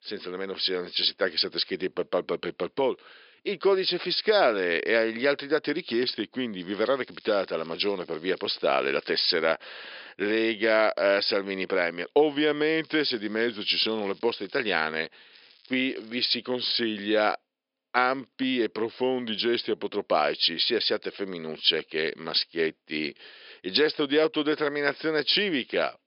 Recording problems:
thin; somewhat; fading below 350 Hz
high frequencies cut off; noticeable; nothing above 5.5 kHz
crackling; faint; from 6.5 to 9 s, from 13 to 15 s and at 15 s; 30 dB below the speech

